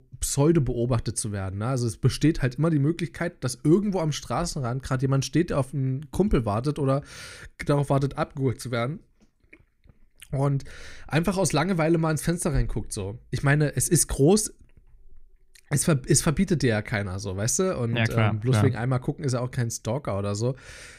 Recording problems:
none

